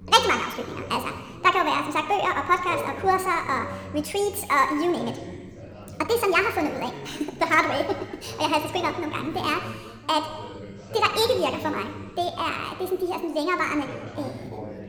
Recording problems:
wrong speed and pitch; too fast and too high; 1.6 times normal speed
room echo; very slight; dies away in 1.3 s
background chatter; noticeable; throughout; 3 voices, 15 dB below the speech

